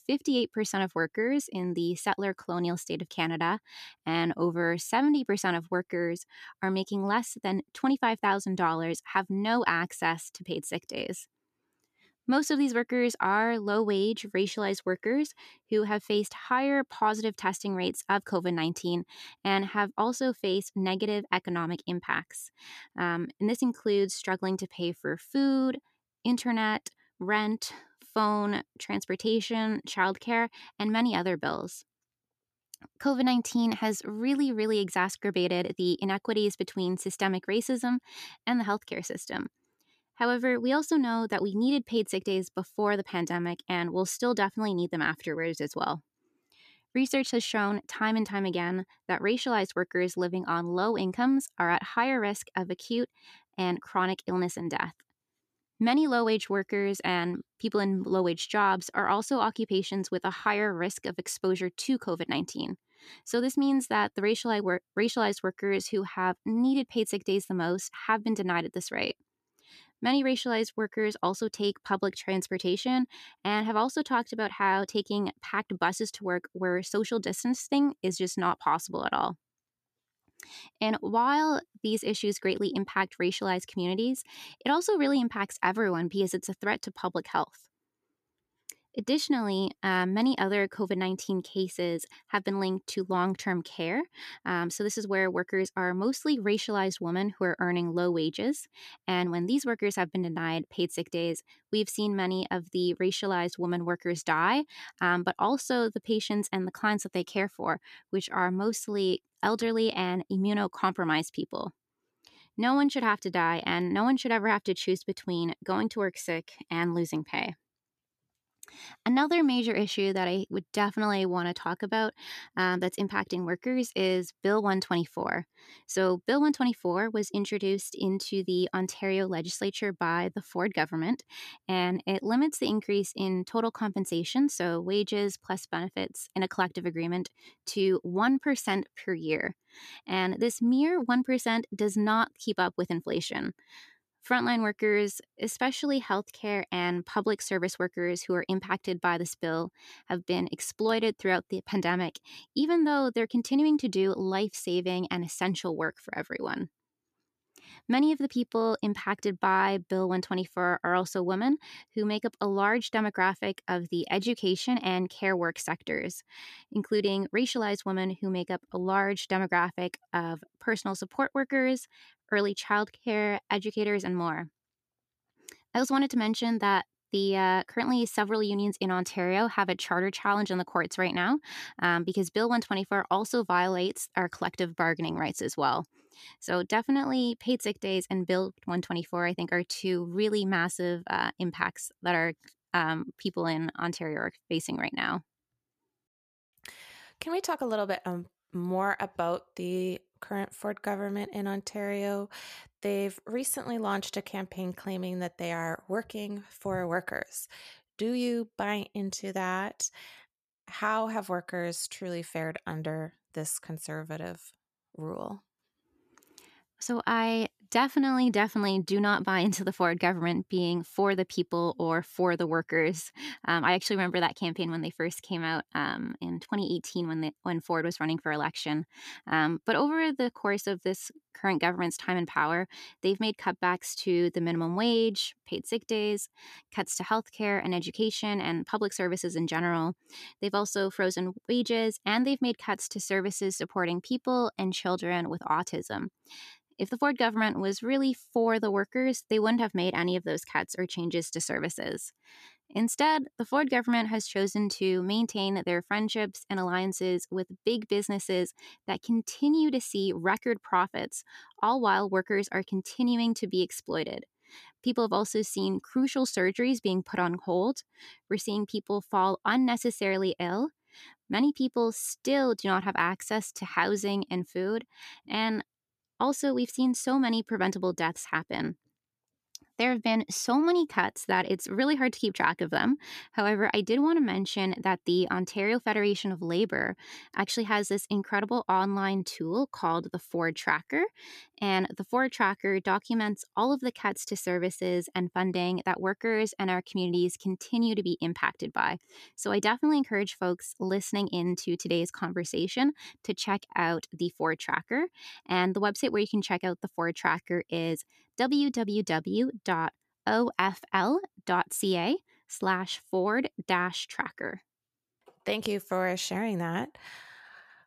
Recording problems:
none

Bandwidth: 14.5 kHz